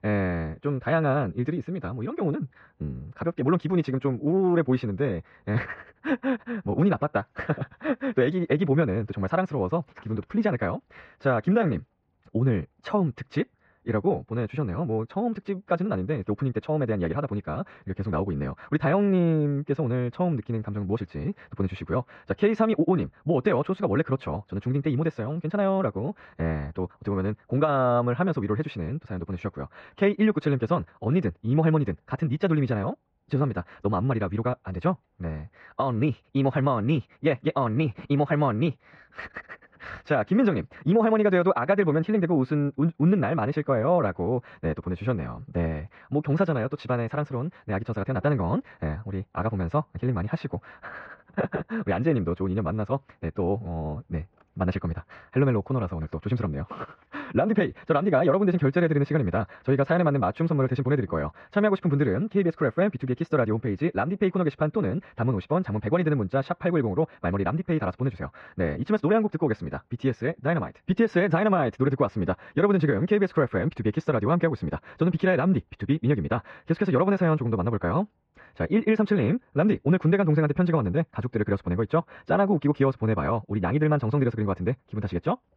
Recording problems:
muffled; very; fading above 2.5 kHz
wrong speed, natural pitch; too fast; 1.7 times normal speed

